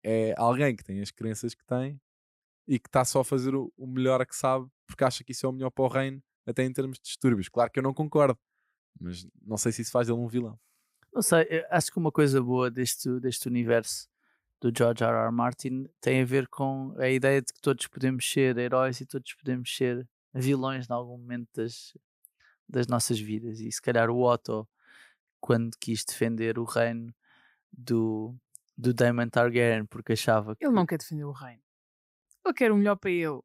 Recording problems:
none

